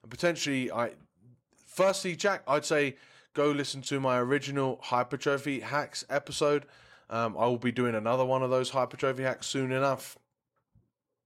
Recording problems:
none

